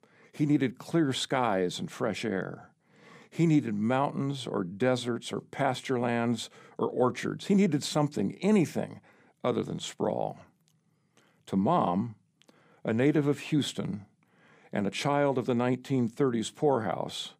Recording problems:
none

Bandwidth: 15 kHz